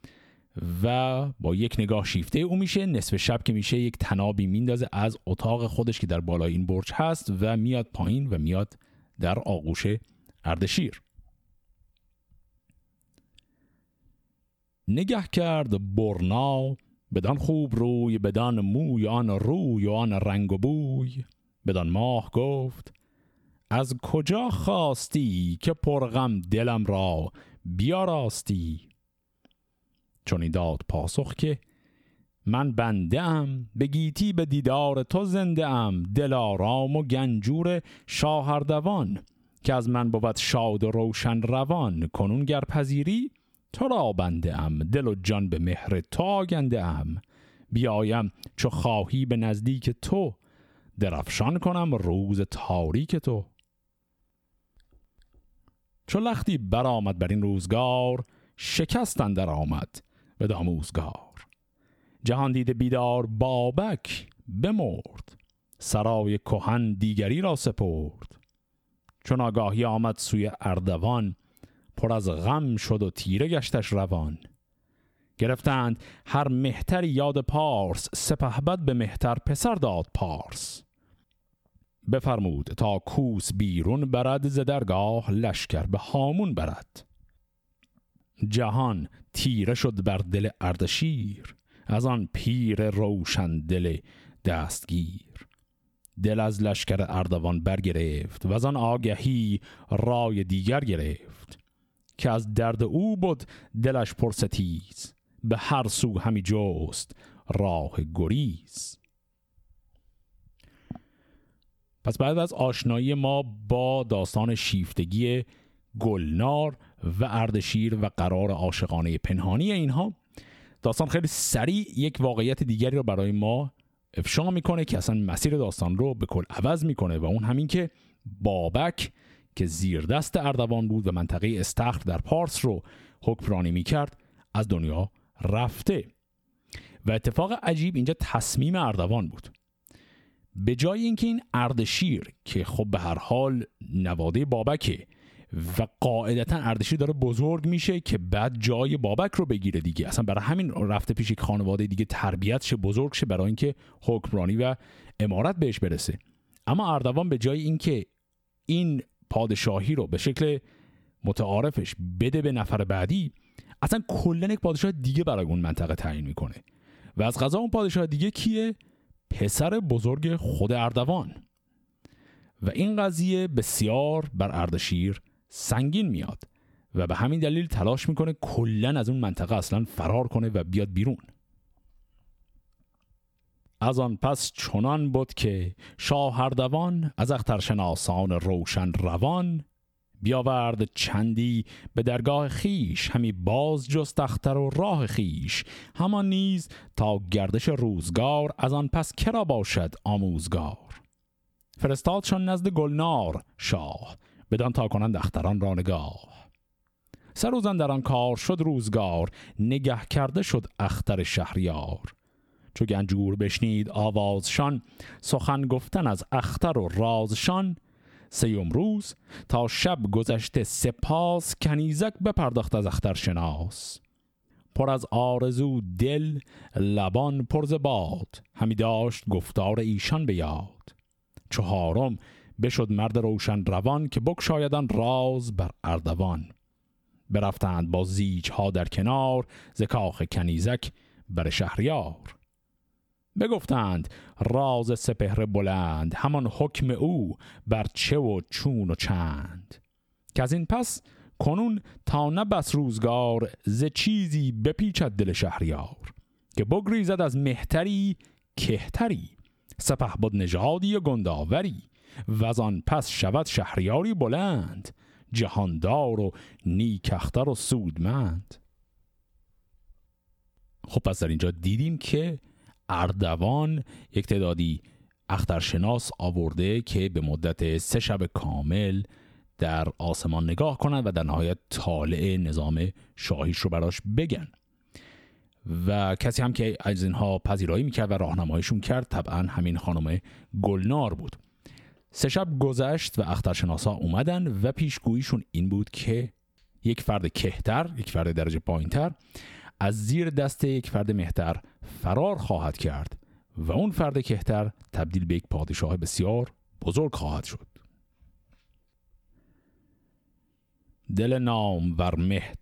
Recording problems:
squashed, flat; heavily

